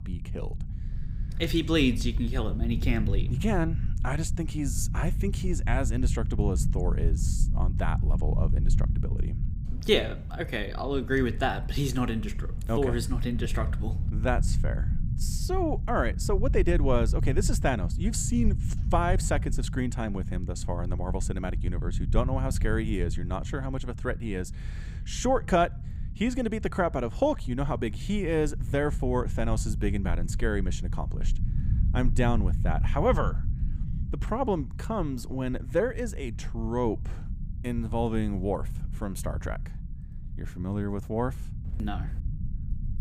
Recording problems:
low rumble; noticeable; throughout; 15 dB below the speech

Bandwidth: 15.5 kHz